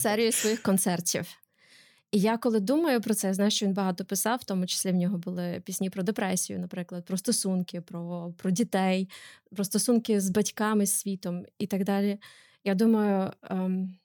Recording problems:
abrupt cut into speech; at the start

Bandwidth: 19 kHz